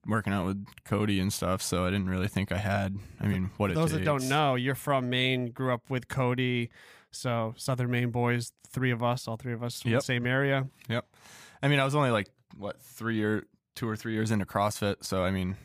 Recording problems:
none

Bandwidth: 15 kHz